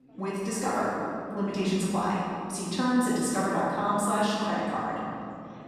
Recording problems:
room echo; strong; dies away in 2.4 s
off-mic speech; far
chatter from many people; faint; throughout; 25 dB below the speech

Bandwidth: 14 kHz